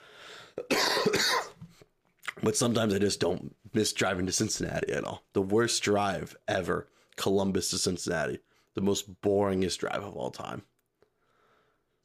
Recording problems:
none

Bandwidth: 15 kHz